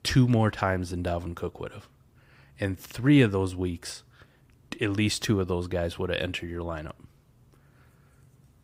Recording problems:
none

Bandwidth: 15.5 kHz